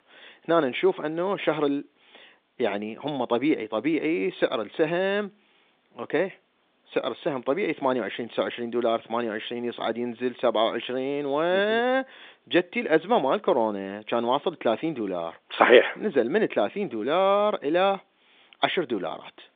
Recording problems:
phone-call audio; nothing above 3.5 kHz

